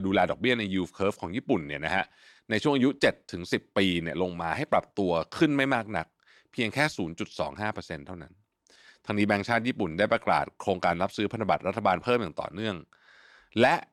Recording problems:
abrupt cut into speech; at the start

